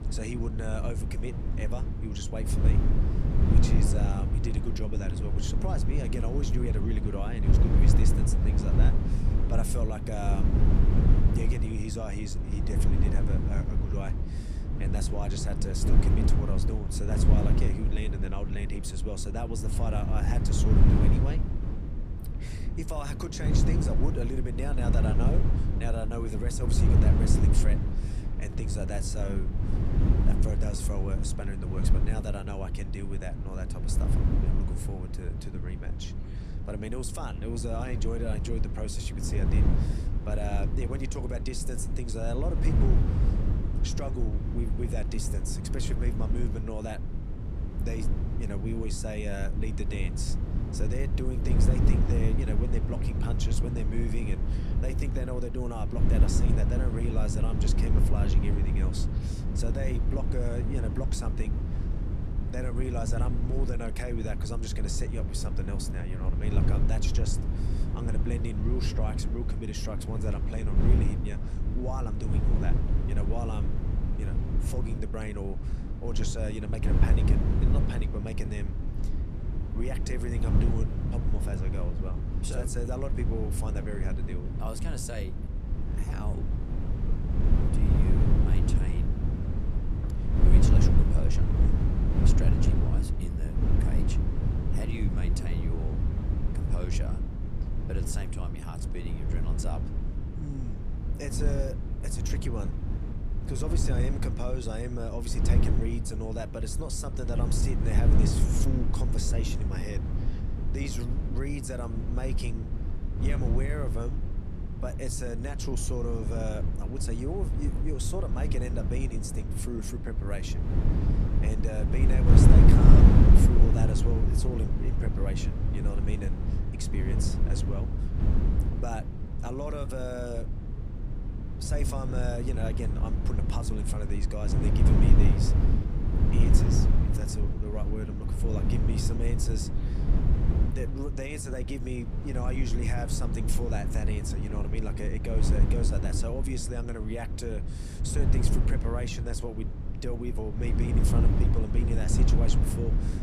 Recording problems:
wind noise on the microphone; heavy; 1 dB below the speech

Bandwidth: 15 kHz